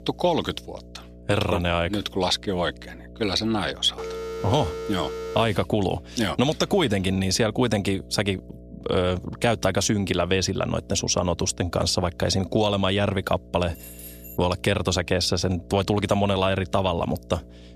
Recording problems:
electrical hum; faint; throughout; 60 Hz, 25 dB below the speech
phone ringing; noticeable; from 4 to 5.5 s; peak 8 dB below the speech
jangling keys; faint; at 14 s; peak 15 dB below the speech

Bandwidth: 14.5 kHz